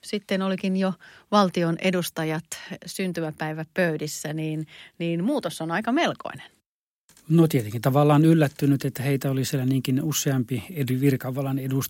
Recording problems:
none

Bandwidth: 16 kHz